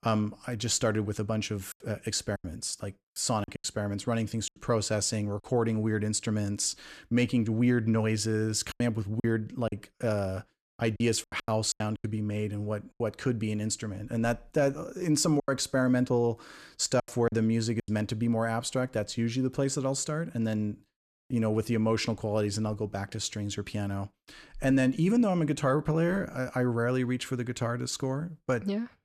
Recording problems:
choppy; very; from 1.5 to 4.5 s, from 8.5 to 13 s and from 15 to 18 s; 11% of the speech affected

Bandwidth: 14 kHz